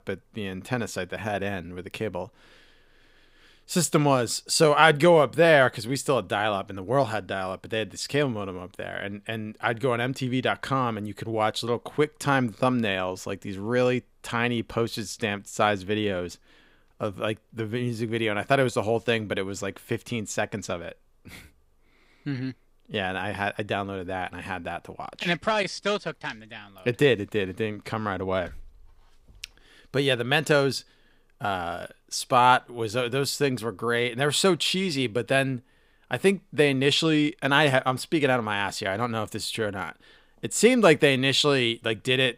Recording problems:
none

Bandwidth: 15.5 kHz